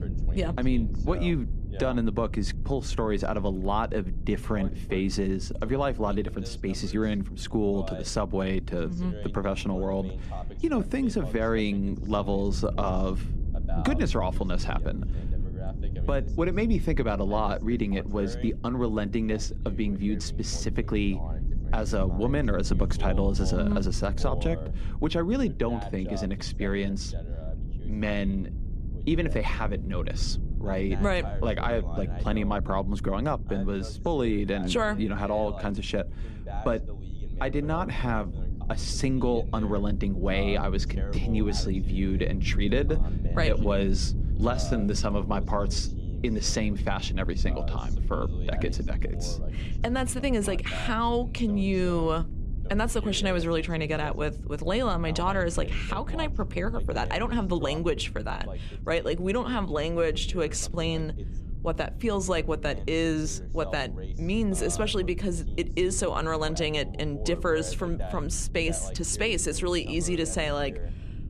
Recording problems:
voice in the background; noticeable; throughout; 15 dB below the speech
low rumble; noticeable; throughout; 20 dB below the speech

